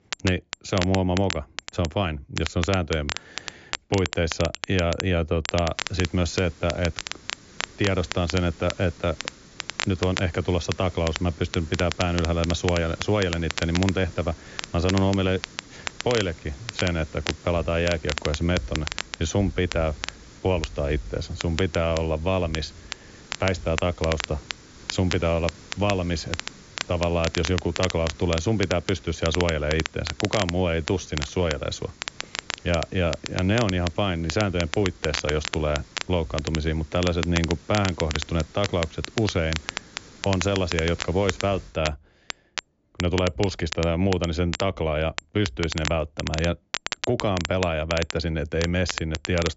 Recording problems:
high frequencies cut off; noticeable; nothing above 7.5 kHz
crackle, like an old record; loud; 8 dB below the speech
hiss; faint; from 6 to 42 s; 20 dB below the speech

